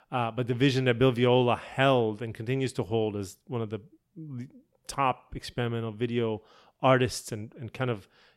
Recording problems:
none

